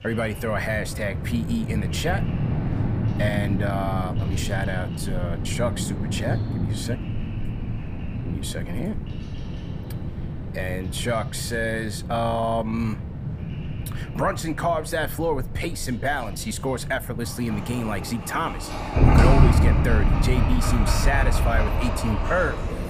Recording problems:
animal sounds; very loud; throughout; 1 dB above the speech

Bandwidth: 15 kHz